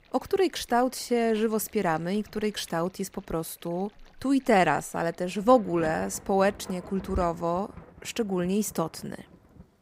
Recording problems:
rain or running water; faint; throughout; 20 dB below the speech

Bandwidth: 15.5 kHz